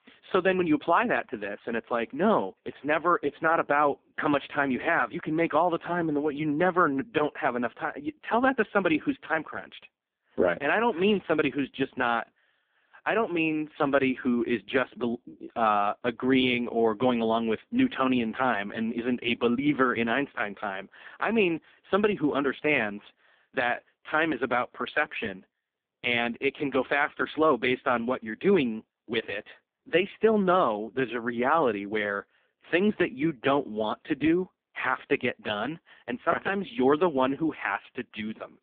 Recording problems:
phone-call audio; poor line

